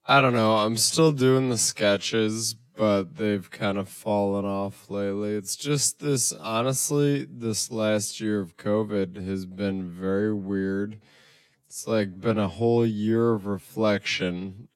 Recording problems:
wrong speed, natural pitch; too slow; 0.6 times normal speed

